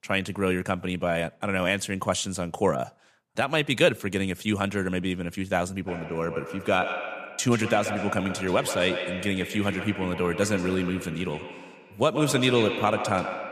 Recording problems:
echo of what is said; strong; from 6 s on; 130 ms later, 7 dB below the speech

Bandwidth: 14.5 kHz